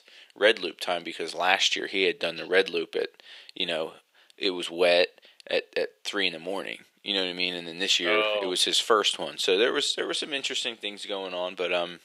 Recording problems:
thin; very; fading below 400 Hz

